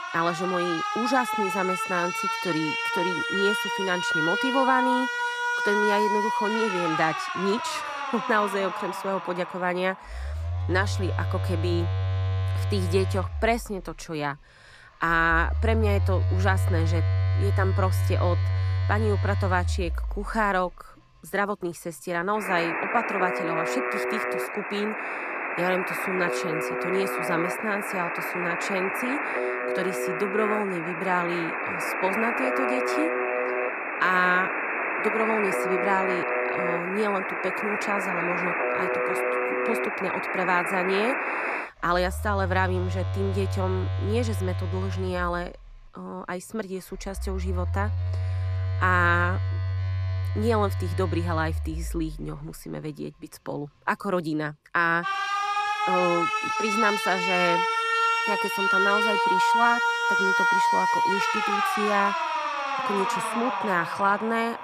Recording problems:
alarms or sirens; very loud; throughout; 2 dB above the speech

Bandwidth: 14 kHz